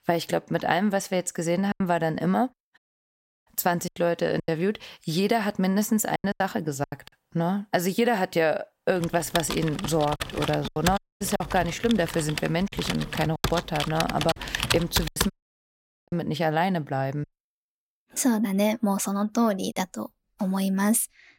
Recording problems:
choppy; very; 7% of the speech affected
audio cutting out; at 3 s for 0.5 s, at 11 s and at 15 s for 1 s
keyboard typing; loud; from 9 to 15 s; peak 1 dB above the speech

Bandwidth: 16 kHz